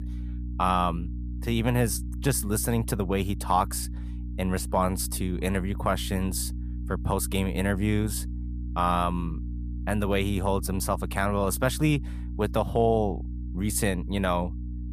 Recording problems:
electrical hum; noticeable; throughout; 60 Hz, 20 dB below the speech

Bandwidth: 14.5 kHz